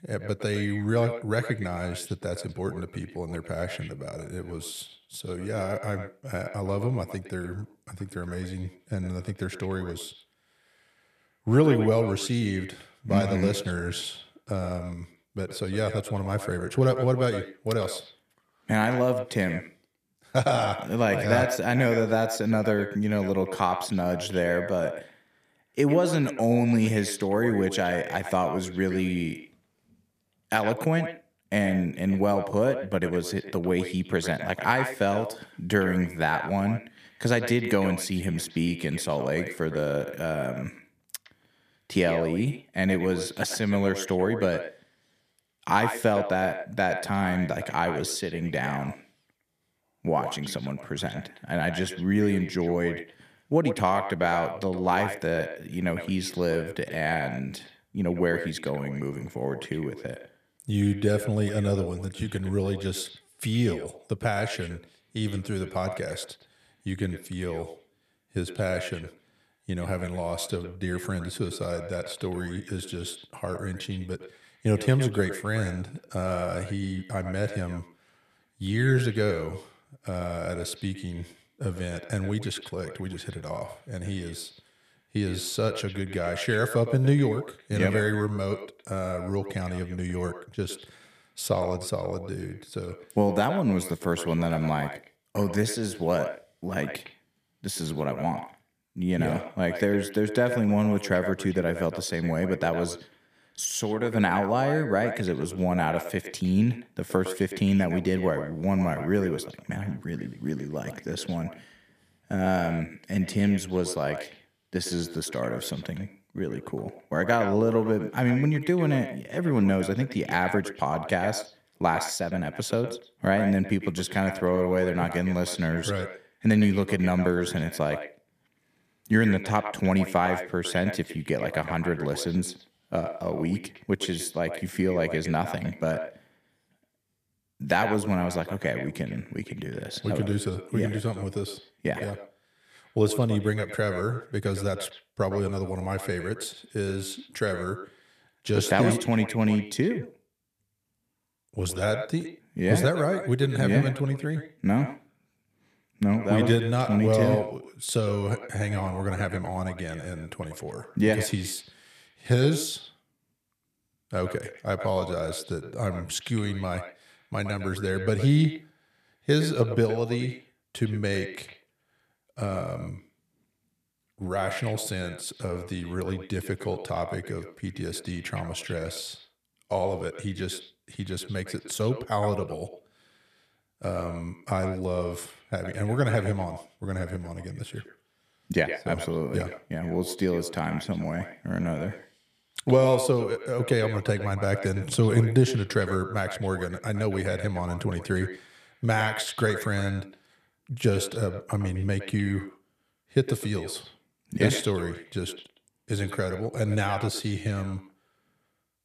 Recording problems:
echo of what is said; strong; throughout; 110 ms later, 10 dB below the speech

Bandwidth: 14.5 kHz